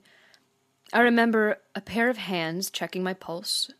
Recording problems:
none

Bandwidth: 14.5 kHz